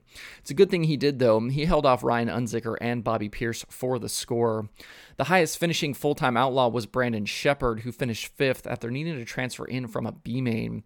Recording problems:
none

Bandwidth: 18 kHz